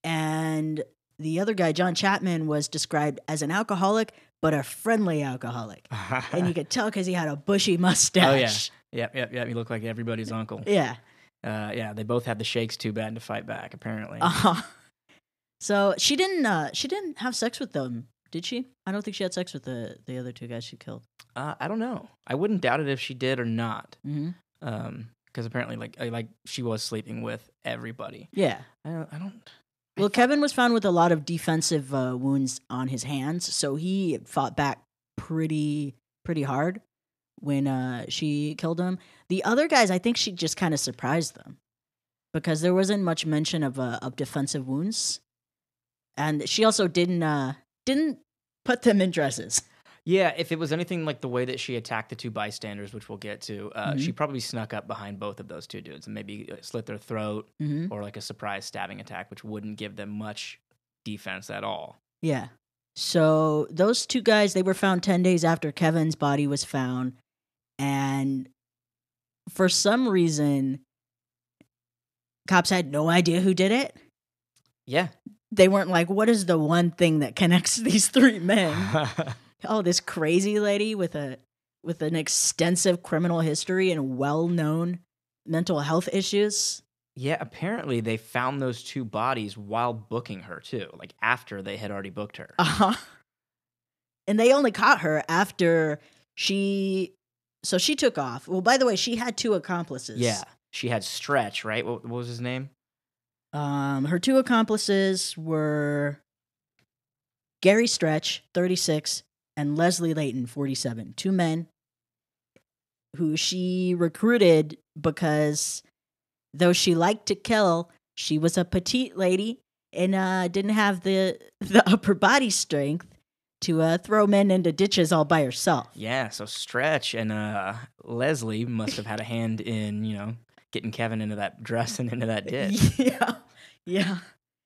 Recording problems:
none

